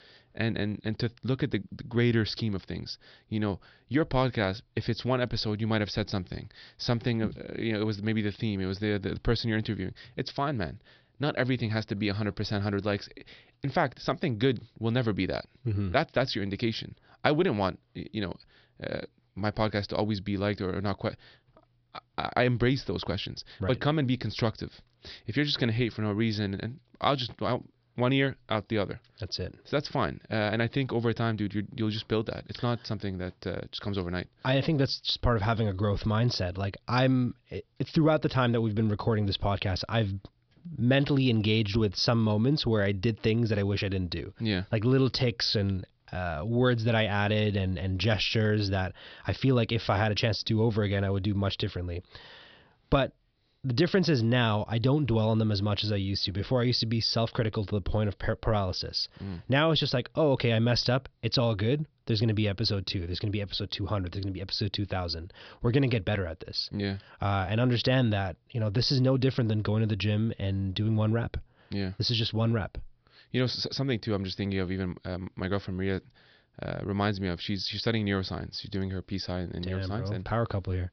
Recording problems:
high frequencies cut off; noticeable; nothing above 5.5 kHz

